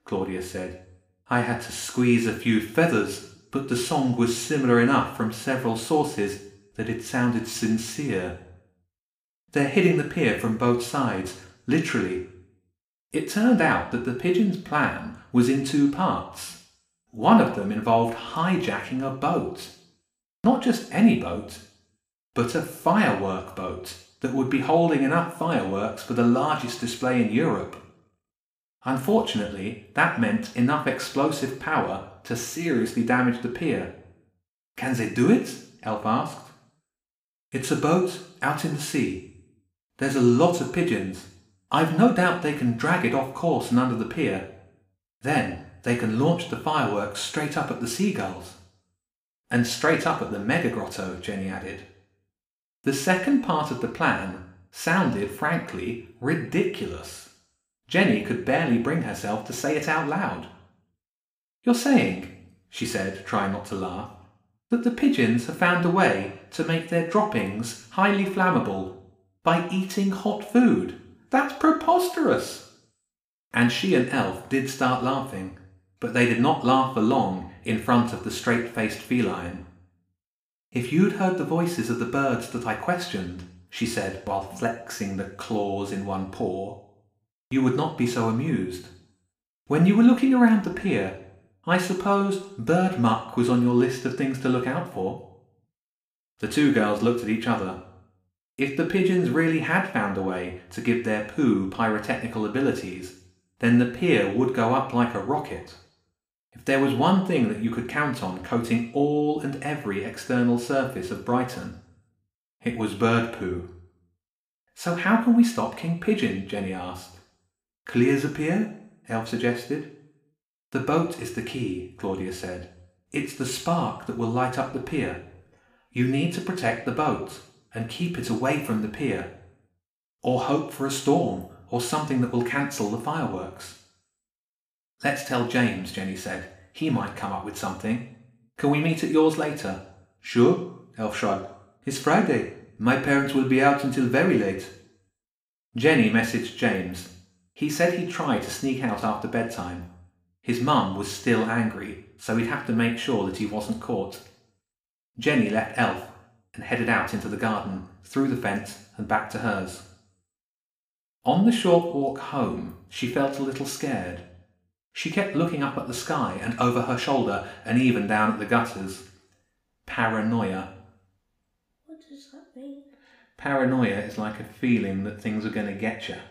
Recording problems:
room echo; slight; dies away in 0.6 s
off-mic speech; somewhat distant

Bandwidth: 15 kHz